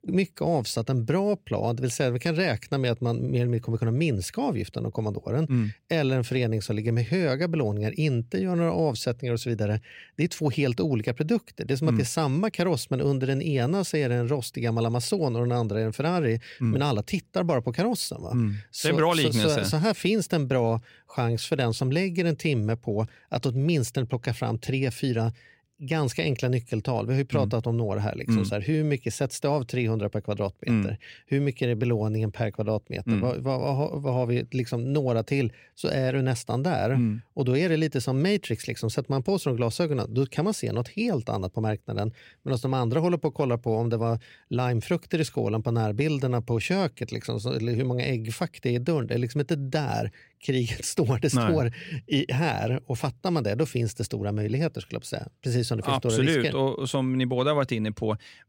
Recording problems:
none

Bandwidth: 16 kHz